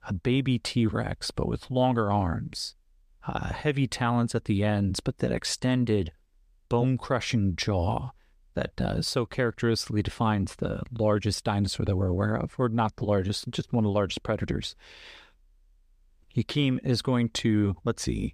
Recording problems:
none

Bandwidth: 14.5 kHz